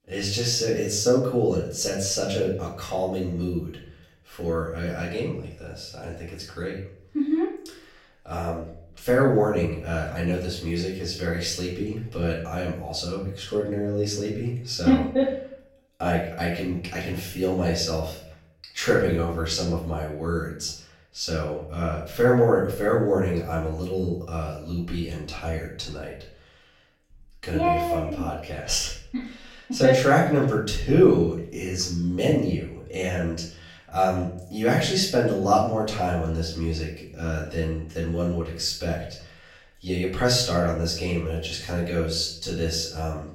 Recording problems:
off-mic speech; far
room echo; noticeable; dies away in 0.5 s

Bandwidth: 16 kHz